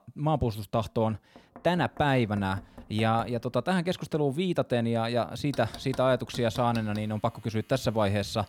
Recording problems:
household noises; faint; throughout; 20 dB below the speech

